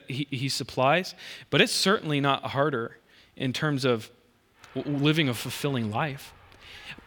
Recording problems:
rain or running water; faint; throughout; 25 dB below the speech

